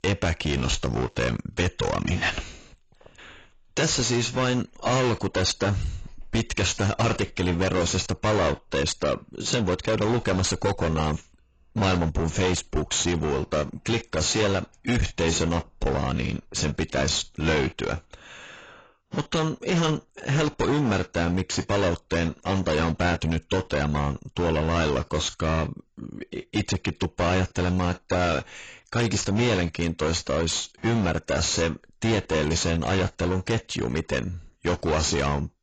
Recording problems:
distortion; heavy; 19% of the sound clipped
garbled, watery; badly; nothing above 7.5 kHz

